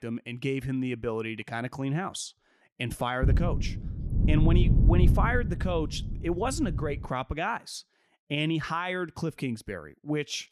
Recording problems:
wind noise on the microphone; heavy; from 3 to 7 s; 8 dB below the speech

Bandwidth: 14.5 kHz